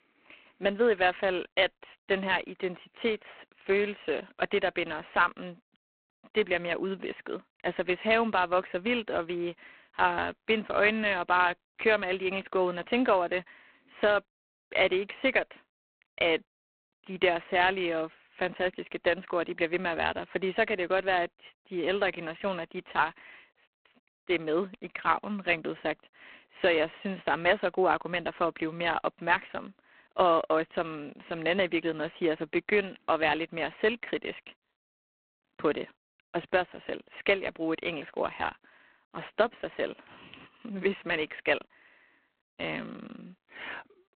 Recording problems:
phone-call audio; poor line

